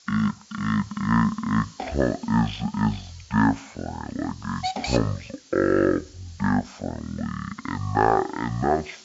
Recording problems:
wrong speed and pitch; too slow and too low; 0.5 times normal speed
high frequencies cut off; slight; nothing above 8 kHz
hiss; noticeable; throughout; 15 dB below the speech

